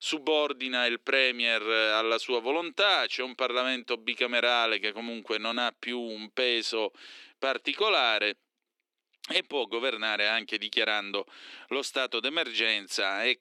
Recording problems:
thin; somewhat; fading below 300 Hz

